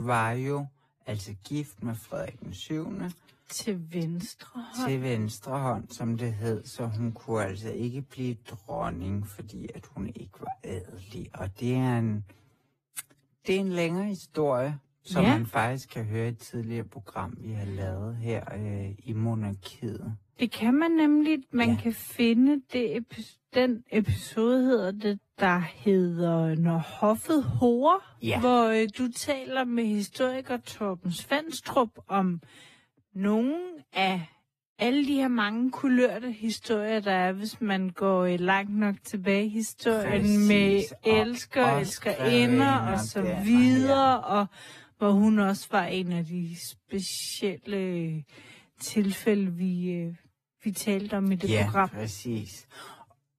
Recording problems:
wrong speed, natural pitch; too slow; 0.6 times normal speed
garbled, watery; slightly; nothing above 14.5 kHz
abrupt cut into speech; at the start

